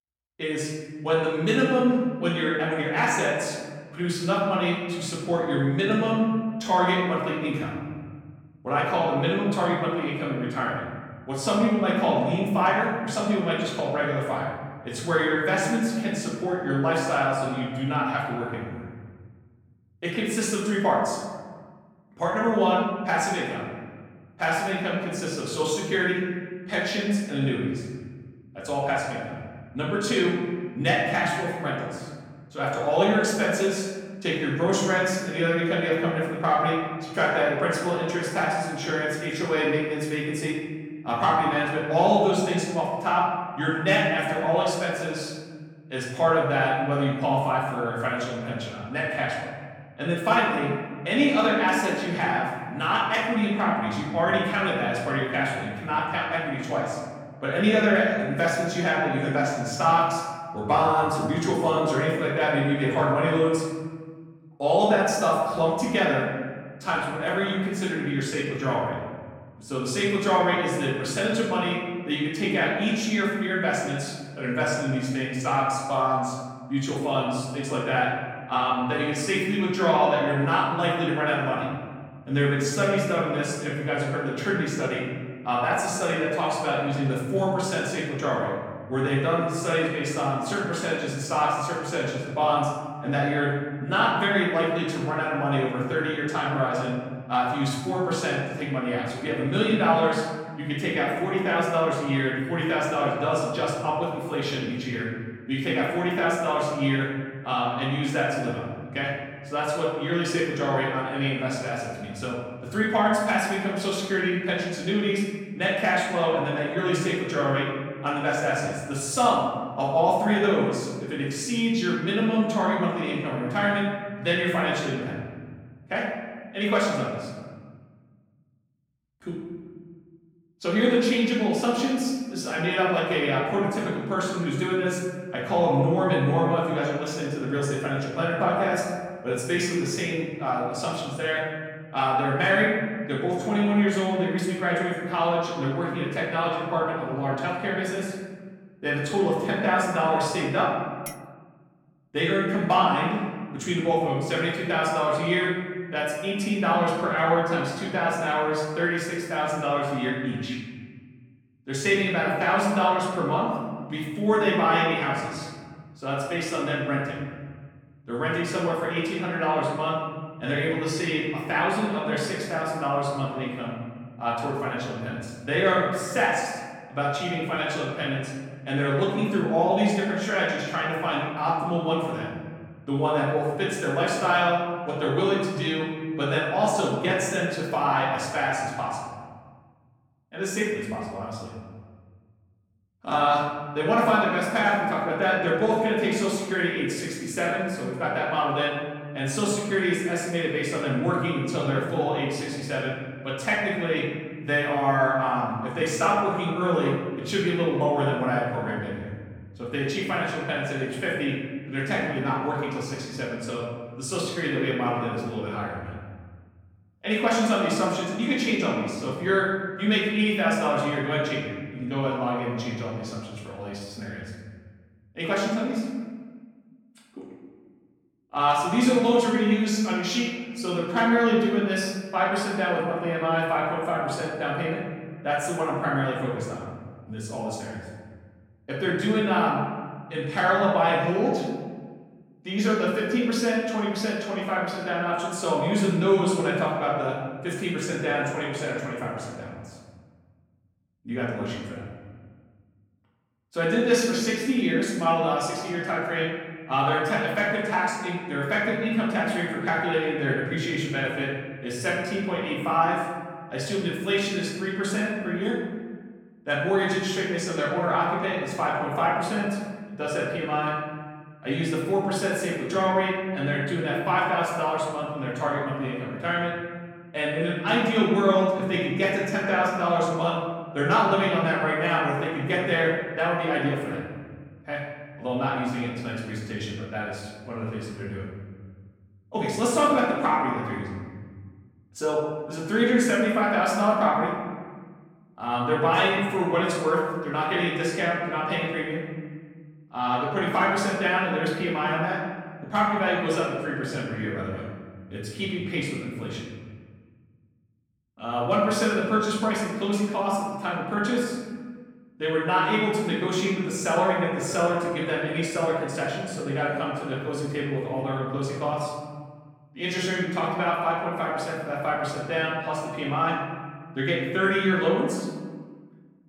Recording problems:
off-mic speech; far
room echo; noticeable; dies away in 1.6 s
clattering dishes; faint; at 2:31; peak 15 dB below the speech

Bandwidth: 18 kHz